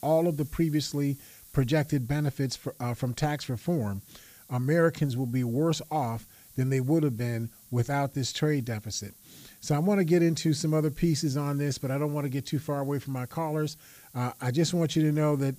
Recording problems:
hiss; faint; throughout; 25 dB below the speech

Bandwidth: 15 kHz